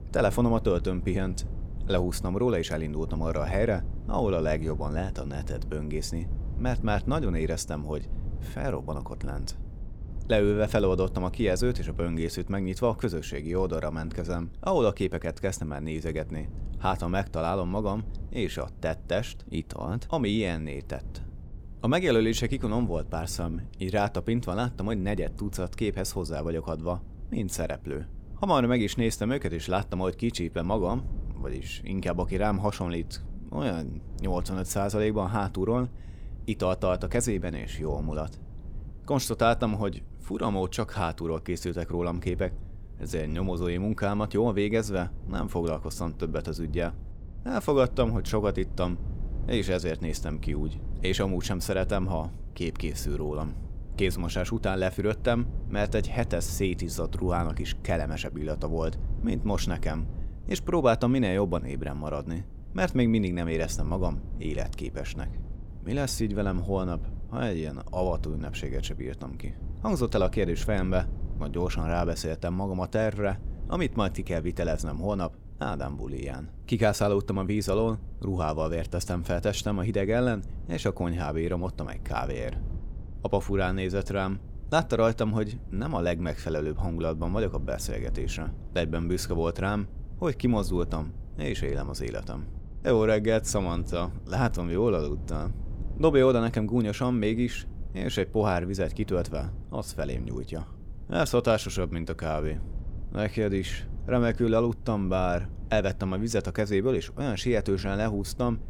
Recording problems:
low rumble; faint; throughout; 20 dB below the speech

